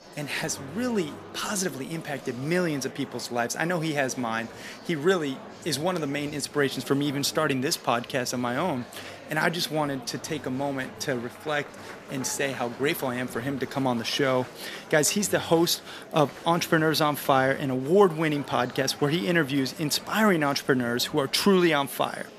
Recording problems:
murmuring crowd; noticeable; throughout; 15 dB below the speech

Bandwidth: 14.5 kHz